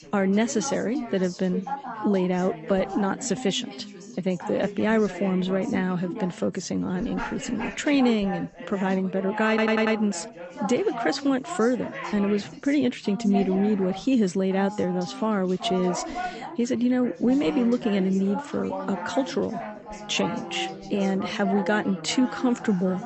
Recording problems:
garbled, watery; slightly; nothing above 8 kHz
background chatter; loud; throughout; 4 voices, 10 dB below the speech
audio stuttering; at 9.5 s

